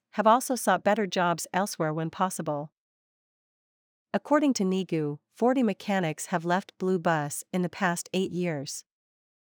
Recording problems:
none

